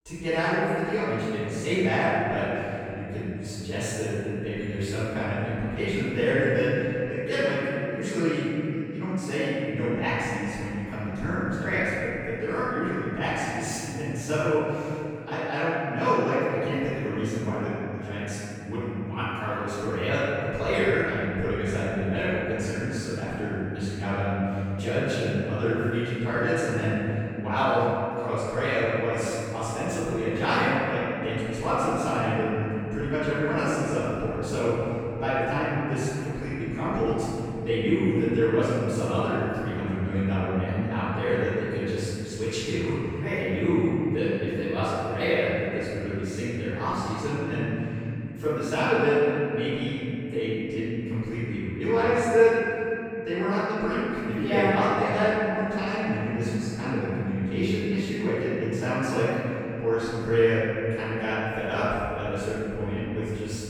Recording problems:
room echo; strong; dies away in 3 s
off-mic speech; far

